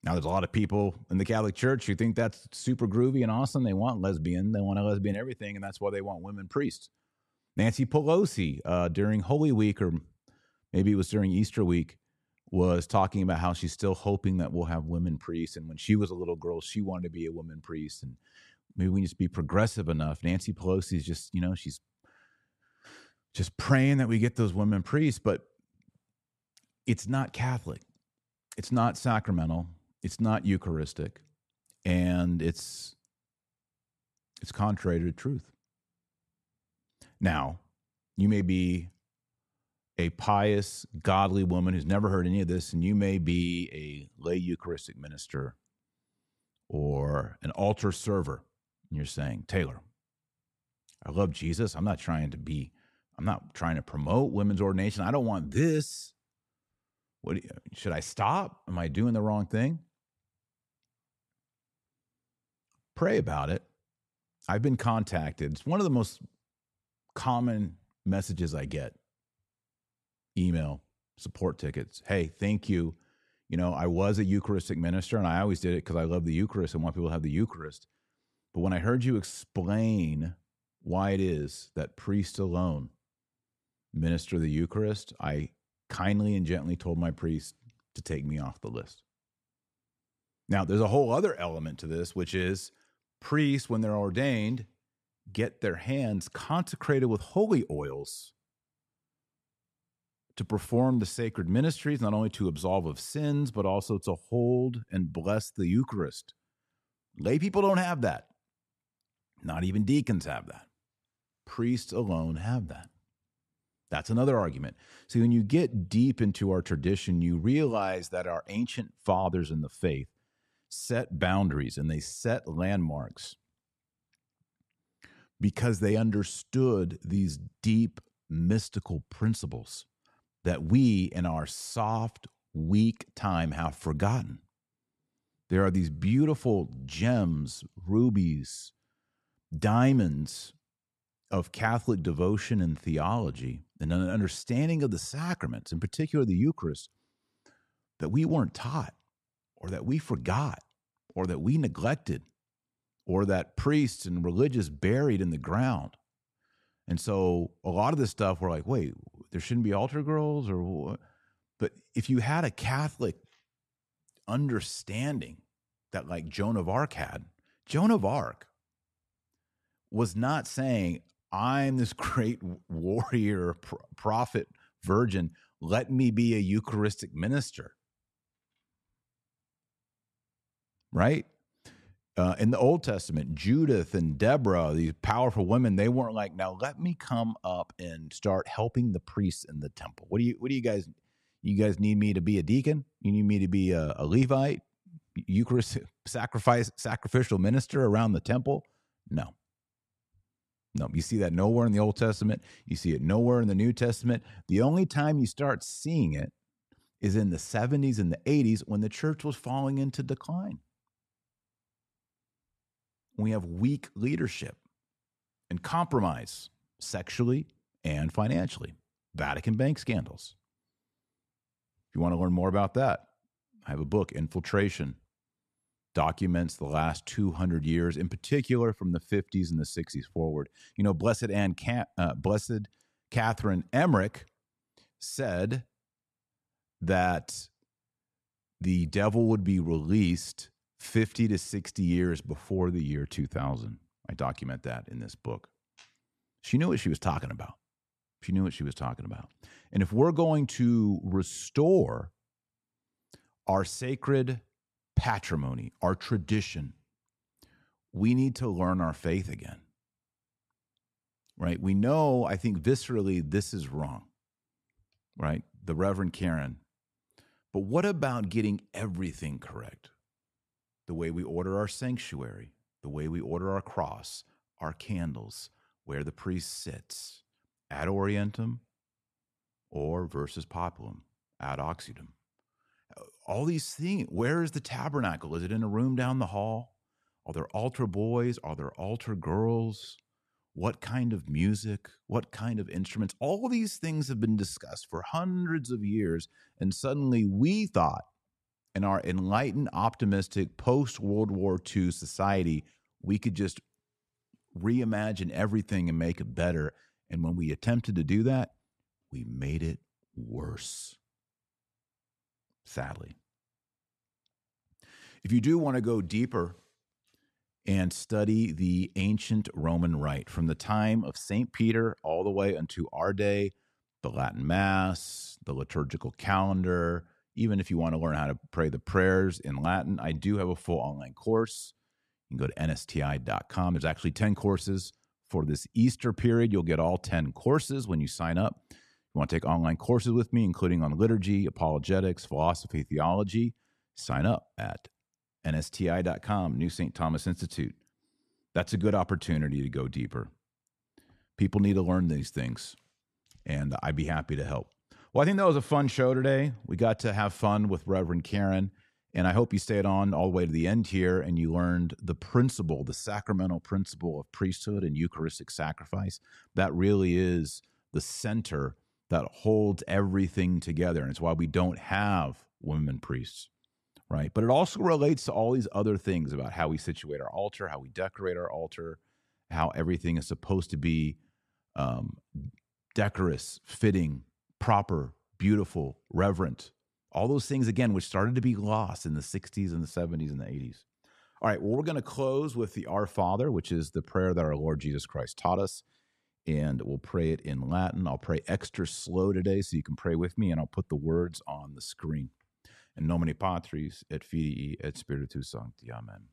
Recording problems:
none

